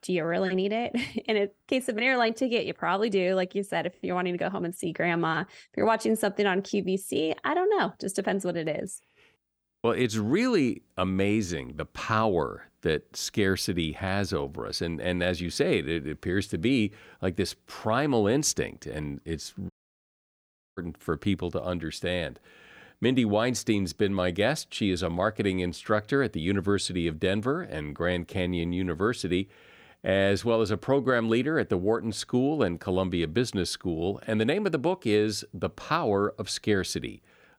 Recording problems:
audio cutting out; at 20 s for 1 s

